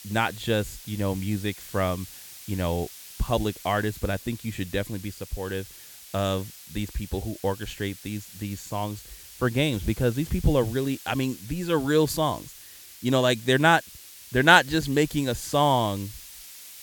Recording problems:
hiss; noticeable; throughout; 15 dB below the speech

